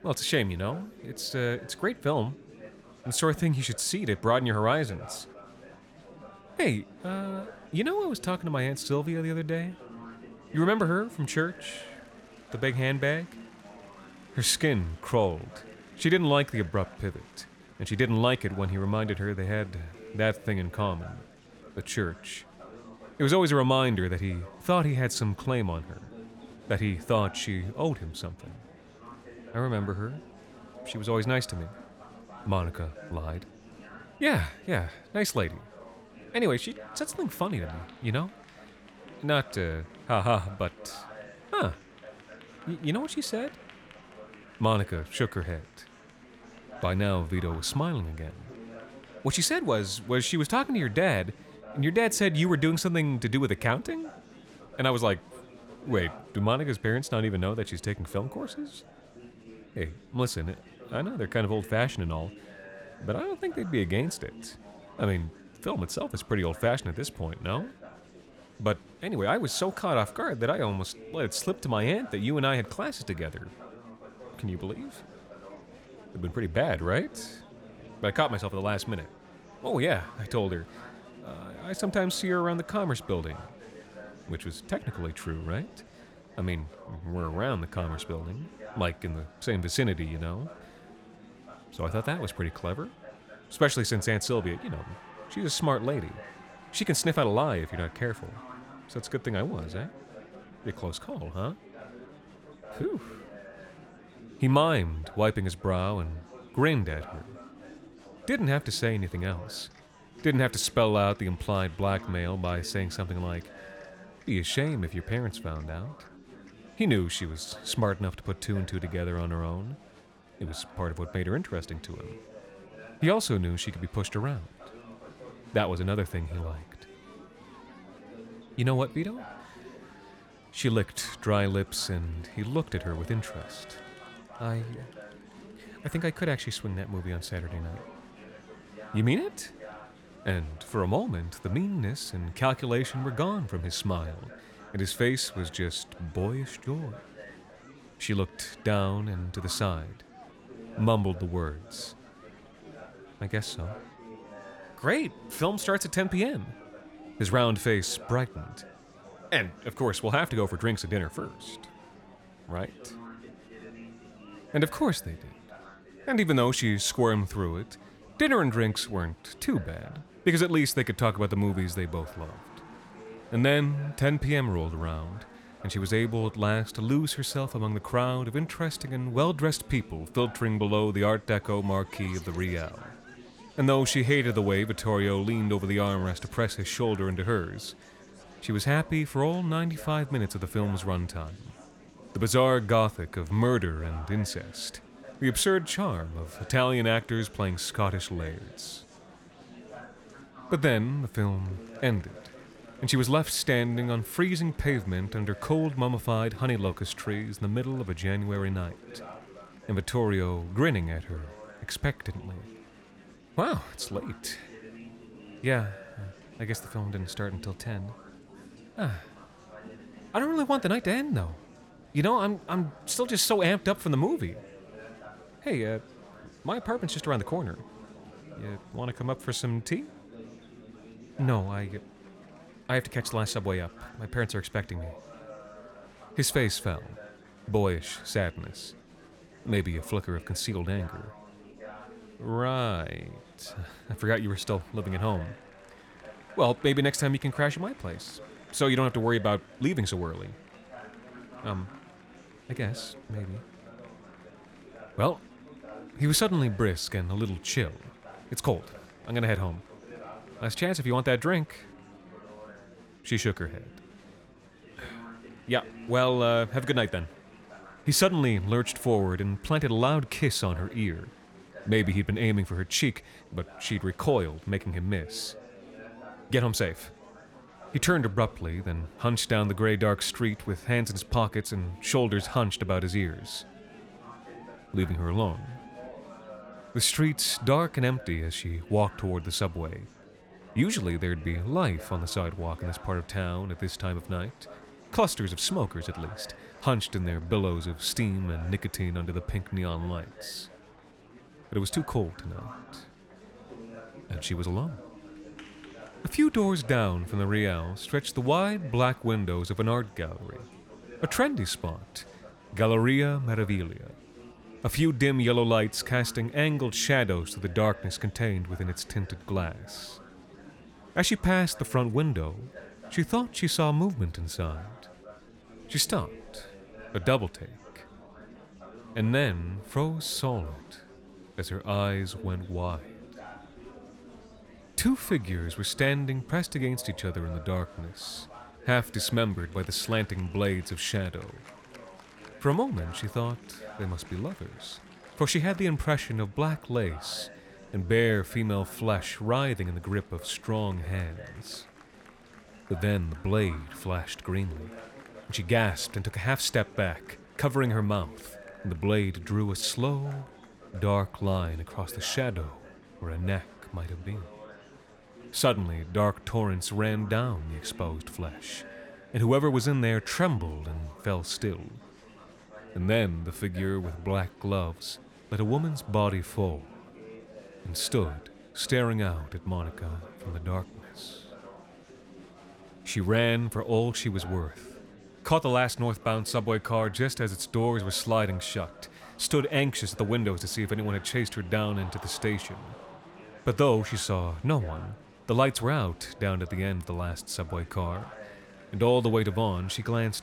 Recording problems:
murmuring crowd; noticeable; throughout; 20 dB below the speech

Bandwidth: 18.5 kHz